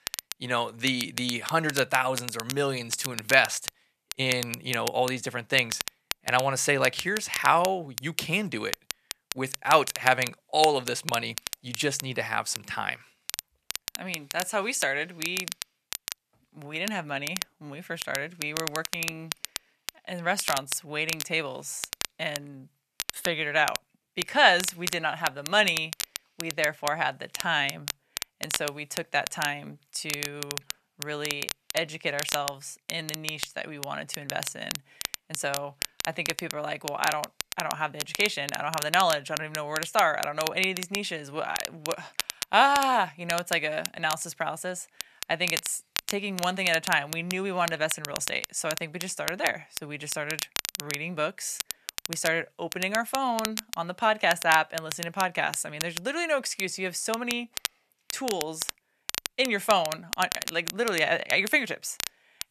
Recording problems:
thin; somewhat; fading below 800 Hz
crackle, like an old record; loud; 7 dB below the speech

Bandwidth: 14 kHz